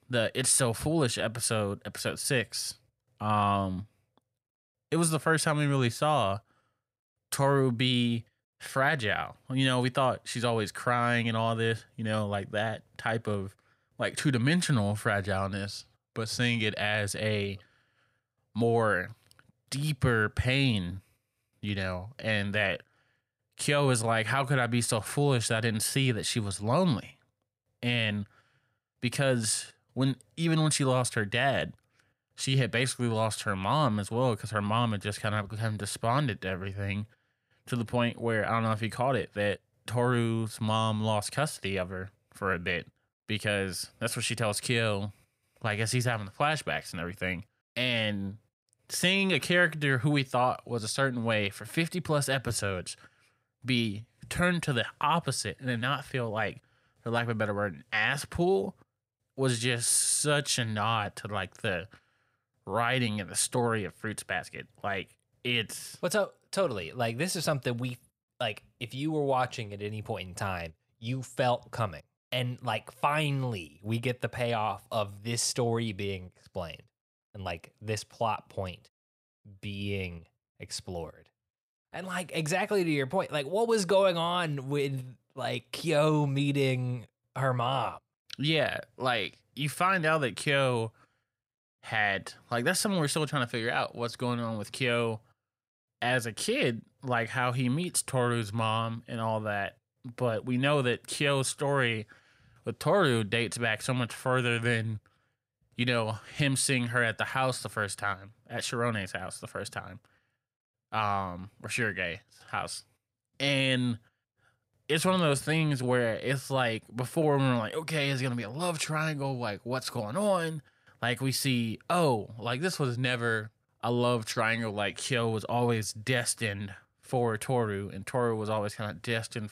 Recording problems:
none

